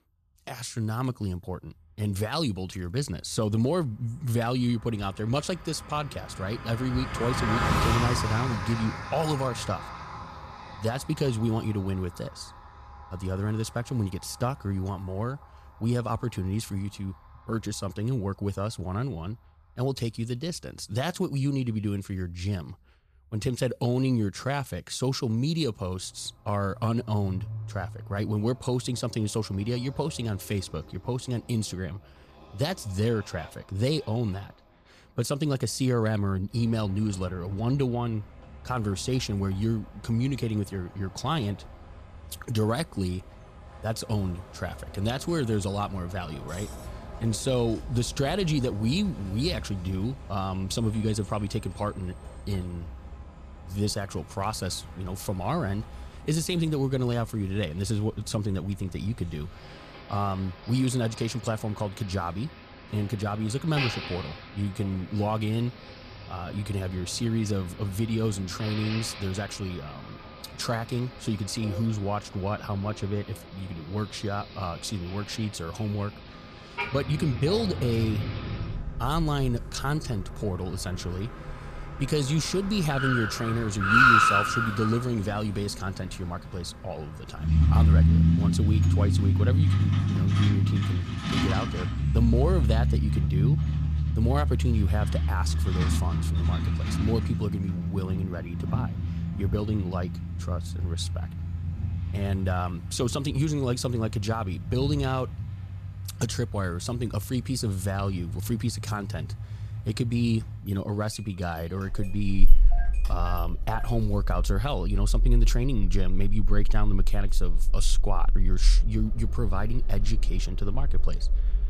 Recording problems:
traffic noise; very loud; throughout; 1 dB above the speech

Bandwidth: 14.5 kHz